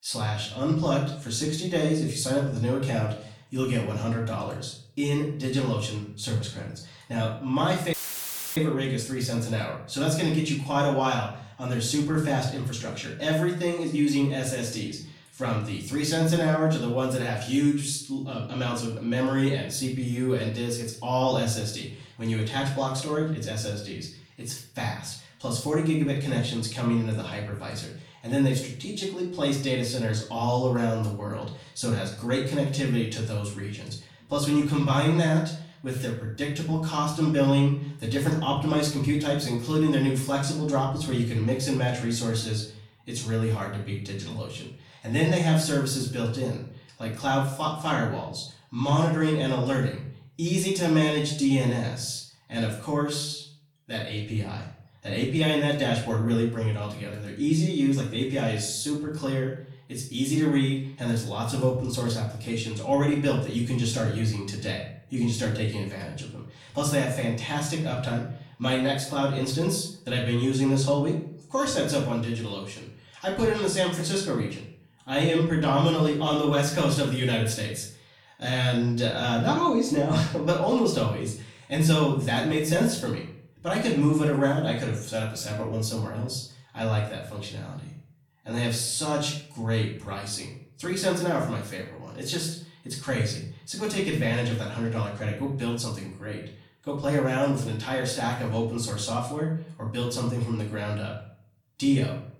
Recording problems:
off-mic speech; far
room echo; noticeable; dies away in 0.5 s
audio cutting out; filled with static; at 8 s for 0.5 s

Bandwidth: 18.5 kHz